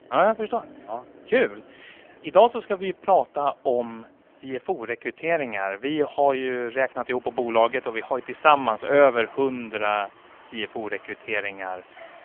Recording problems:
phone-call audio; poor line; nothing above 3.5 kHz
traffic noise; faint; throughout; 25 dB below the speech

